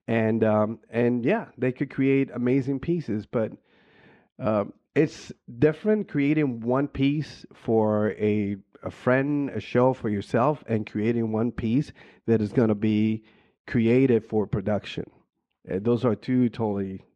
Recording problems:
muffled; slightly; fading above 2.5 kHz

